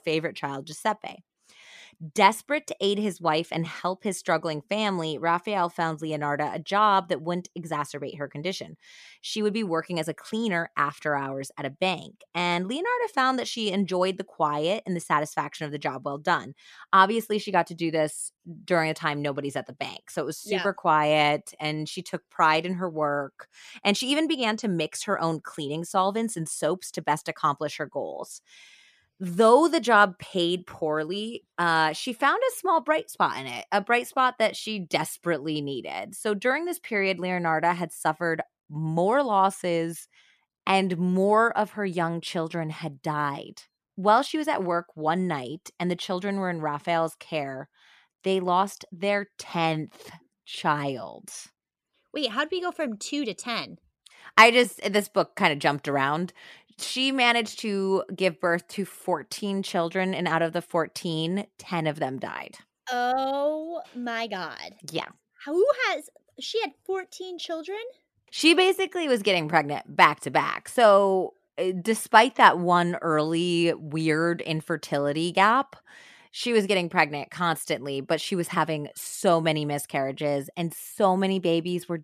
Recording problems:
none

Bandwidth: 14.5 kHz